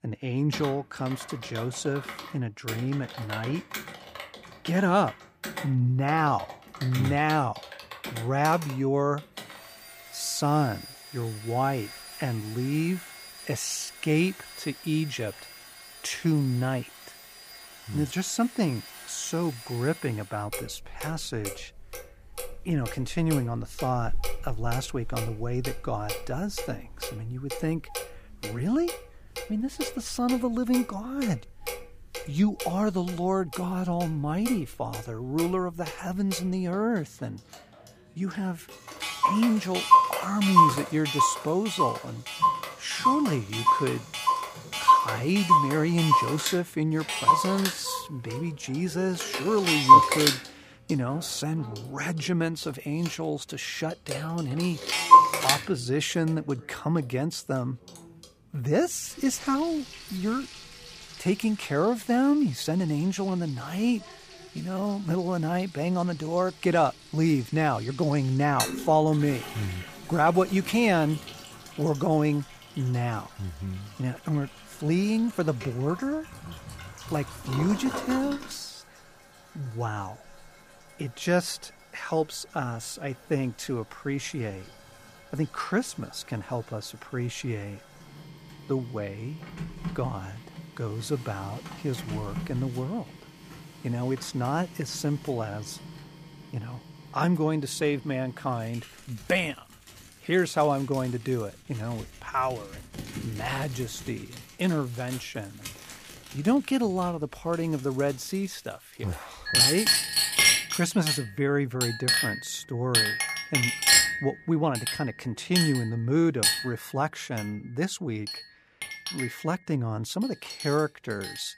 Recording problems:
household noises; very loud; throughout; 3 dB above the speech

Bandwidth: 15 kHz